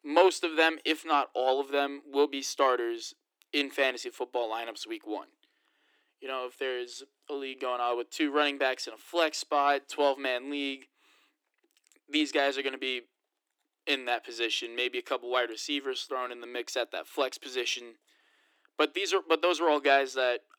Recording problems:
thin; somewhat; fading below 300 Hz

